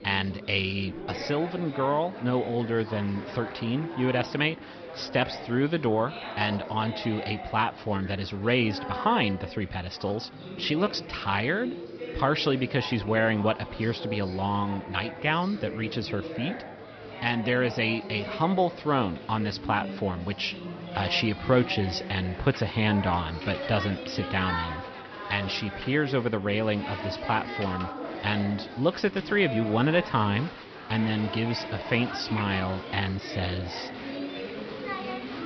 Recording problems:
high frequencies cut off; noticeable; nothing above 5.5 kHz
murmuring crowd; loud; throughout; 10 dB below the speech

